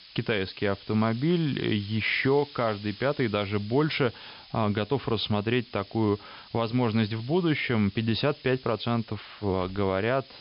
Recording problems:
high frequencies cut off; noticeable; nothing above 5.5 kHz
hiss; noticeable; throughout; 20 dB below the speech

